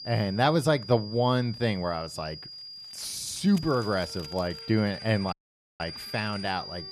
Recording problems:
high-pitched whine; noticeable; throughout; 5 kHz, 10 dB below the speech
background music; faint; throughout; 25 dB below the speech
household noises; faint; from 3 s on; 25 dB below the speech
audio cutting out; at 5.5 s

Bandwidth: 14 kHz